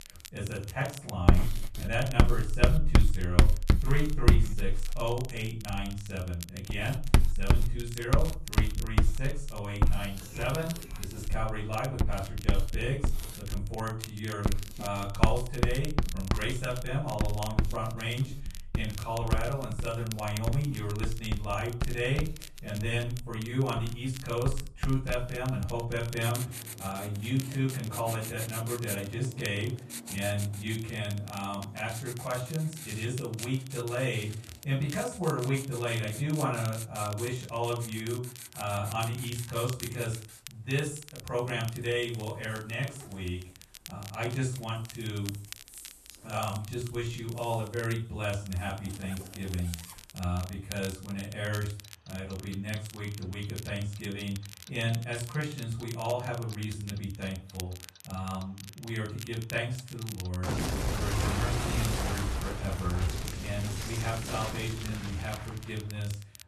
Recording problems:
off-mic speech; far
room echo; slight; dies away in 0.3 s
household noises; very loud; throughout; as loud as the speech
crackle, like an old record; noticeable; 15 dB below the speech

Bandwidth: 13.5 kHz